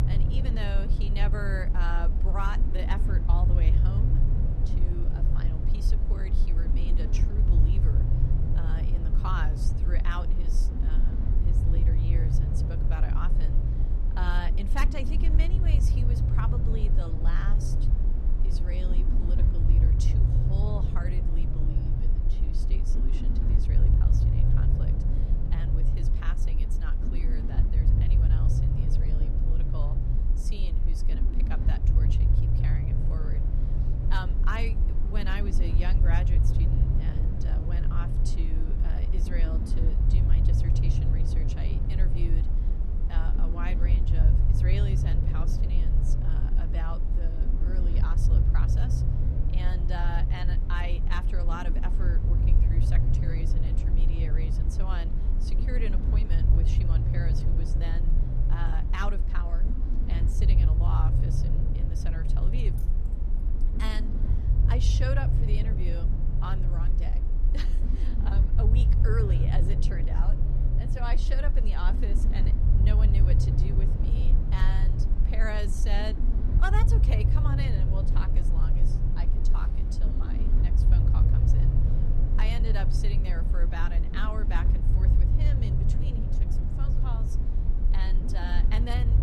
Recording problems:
low rumble; loud; throughout; 2 dB below the speech
jangling keys; faint; at 1:03; peak 15 dB below the speech

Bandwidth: 14.5 kHz